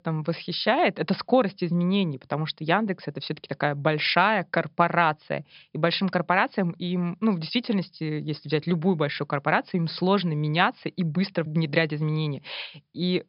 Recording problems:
high frequencies cut off; noticeable; nothing above 5.5 kHz

